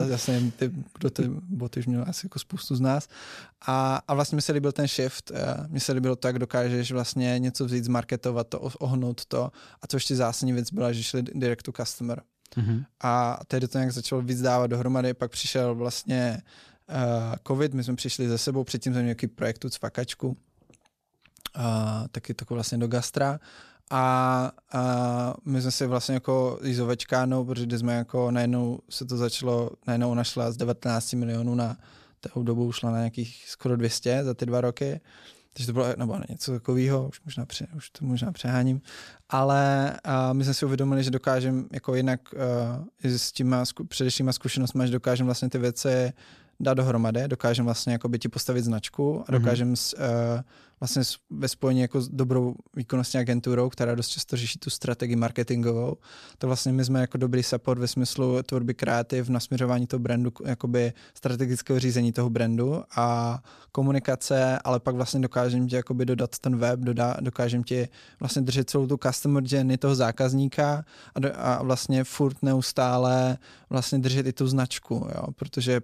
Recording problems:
abrupt cut into speech; at the start

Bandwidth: 14.5 kHz